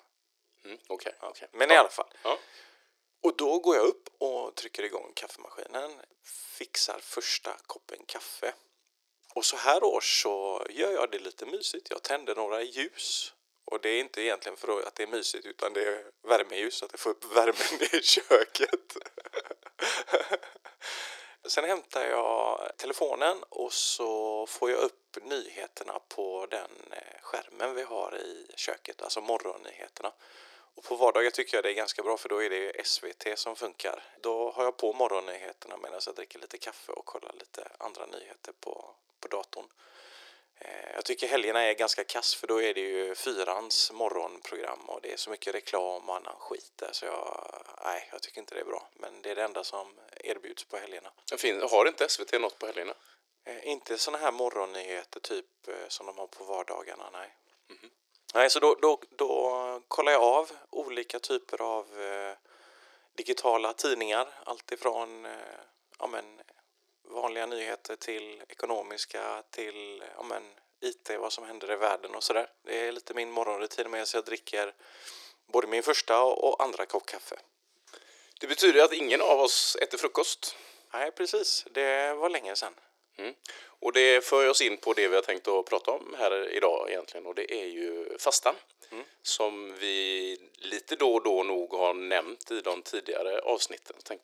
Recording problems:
thin; very; fading below 350 Hz

